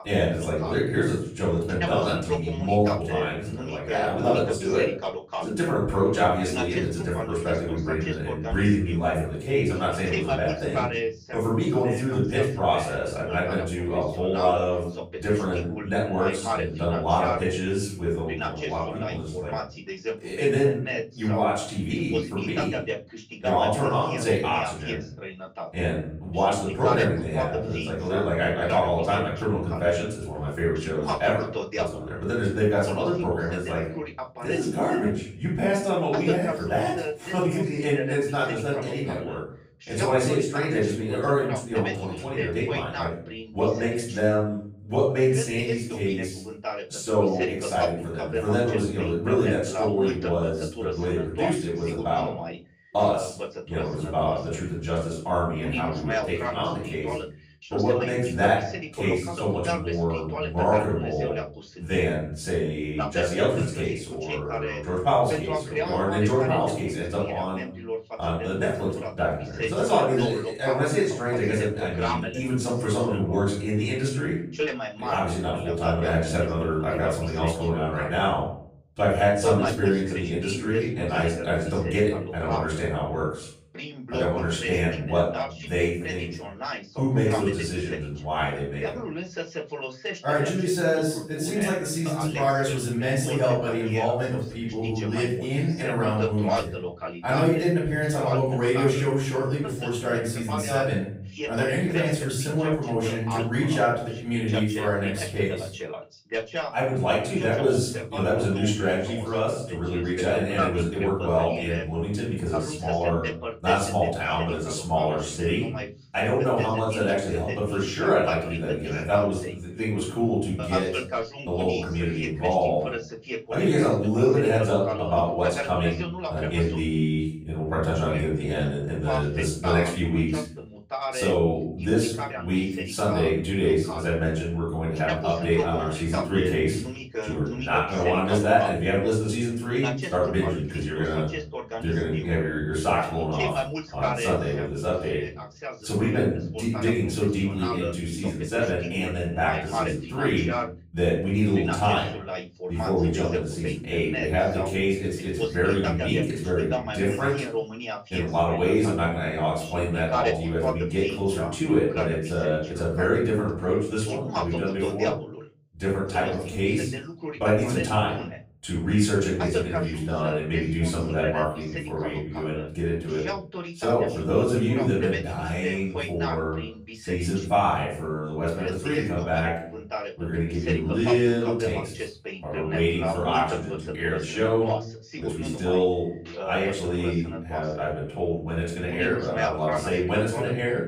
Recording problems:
off-mic speech; far
room echo; noticeable; dies away in 0.5 s
voice in the background; loud; throughout; 8 dB below the speech

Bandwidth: 15.5 kHz